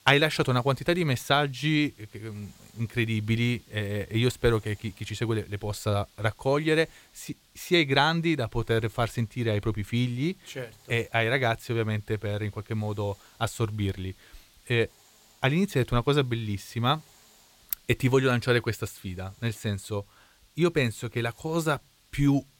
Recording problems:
hiss; faint; throughout; 30 dB below the speech

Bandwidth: 16.5 kHz